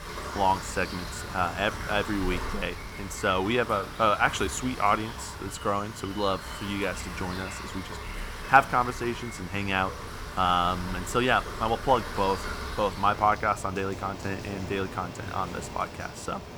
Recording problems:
rain or running water; loud; throughout; 10 dB below the speech

